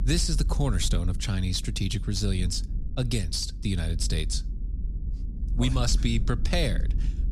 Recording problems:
low rumble; noticeable; throughout; 15 dB below the speech

